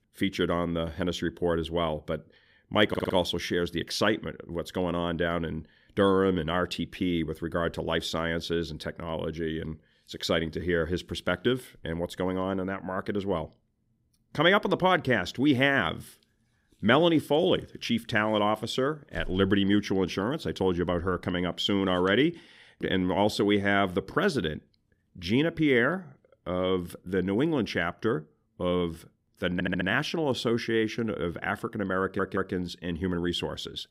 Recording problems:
audio stuttering; at 3 s, at 30 s and at 32 s

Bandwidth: 15.5 kHz